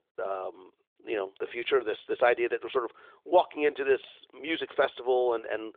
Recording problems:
phone-call audio

